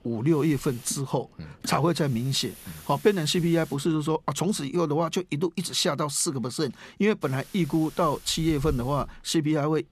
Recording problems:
hiss; noticeable; until 5 s and from 7 s on; 20 dB below the speech

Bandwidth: 14 kHz